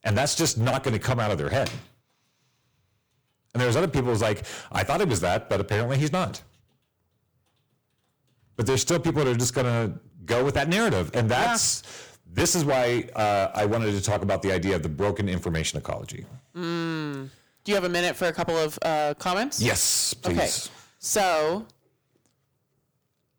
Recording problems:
distortion; heavy; 12% of the sound clipped

